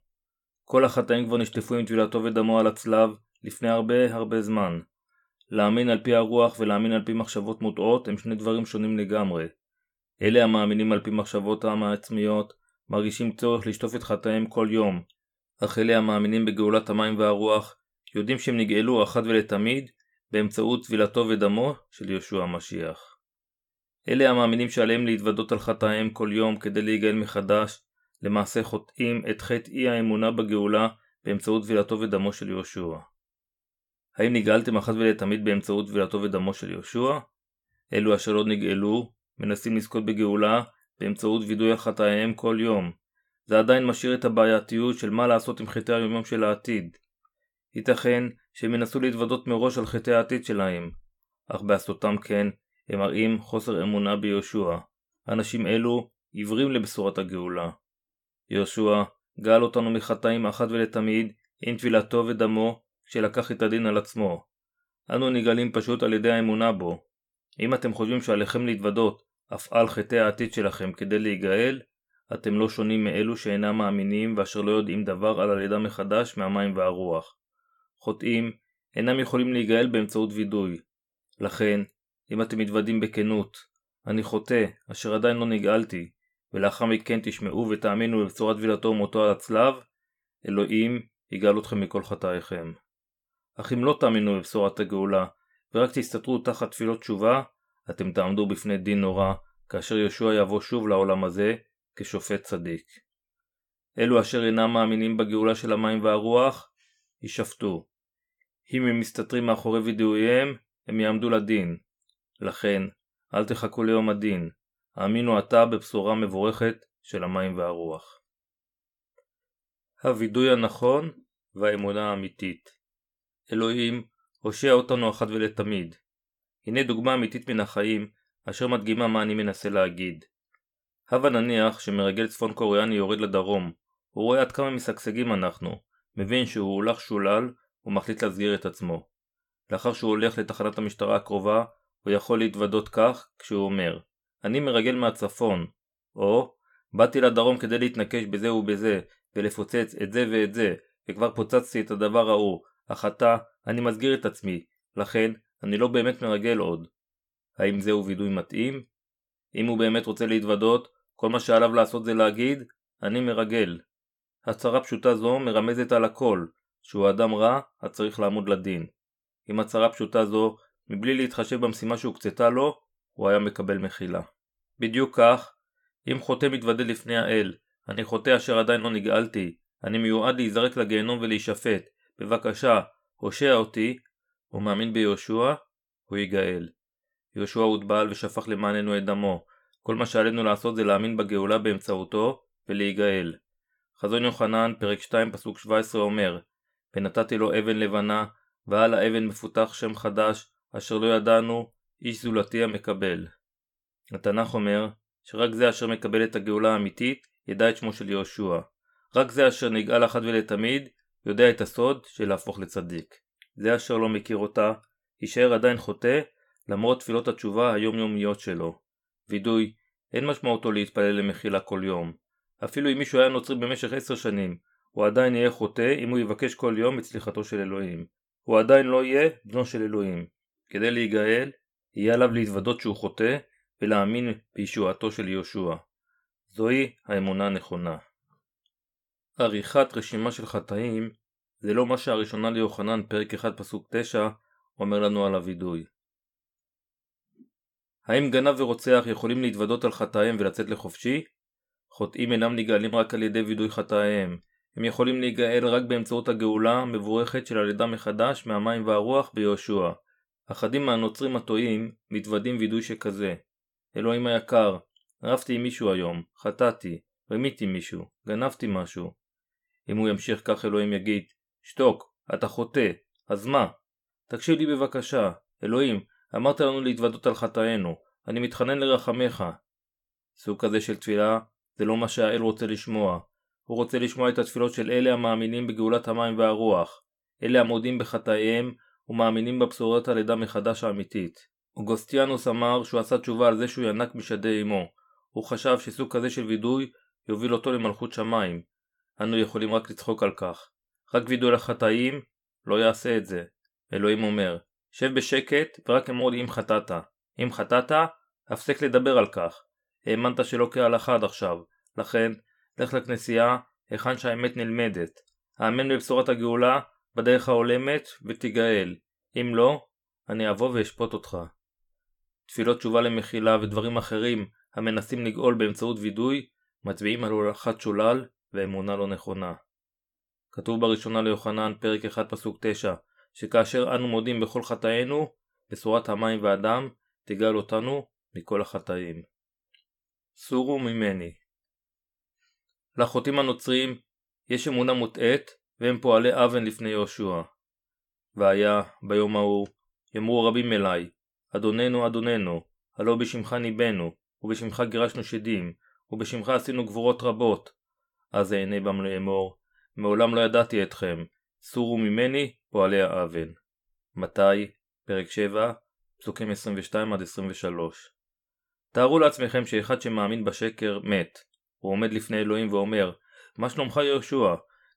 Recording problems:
none

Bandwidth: 17.5 kHz